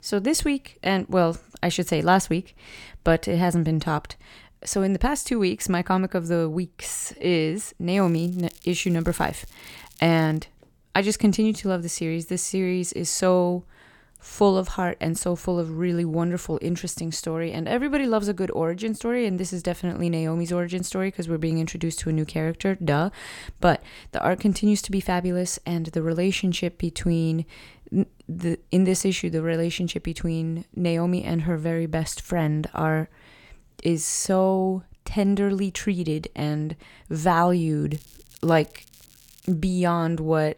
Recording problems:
crackling; faint; from 8 to 10 s and from 38 to 40 s; 25 dB below the speech

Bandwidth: 18.5 kHz